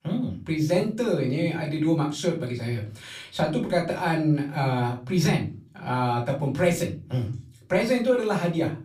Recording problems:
off-mic speech; far
room echo; slight; dies away in 0.4 s

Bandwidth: 15.5 kHz